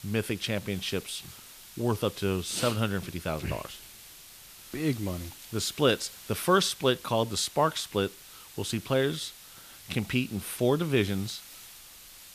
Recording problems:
hiss; noticeable; throughout; 15 dB below the speech

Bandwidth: 14.5 kHz